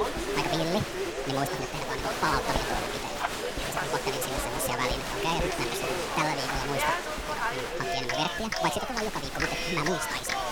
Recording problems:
wrong speed and pitch; too fast and too high; 1.6 times normal speed
crowd noise; very loud; throughout; 1 dB above the speech
household noises; noticeable; throughout; 15 dB below the speech

